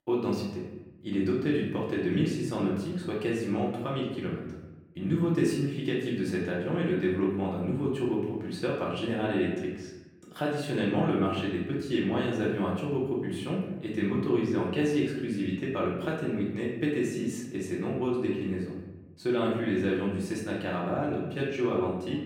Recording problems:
off-mic speech; far
room echo; noticeable; dies away in 0.9 s

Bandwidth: 18 kHz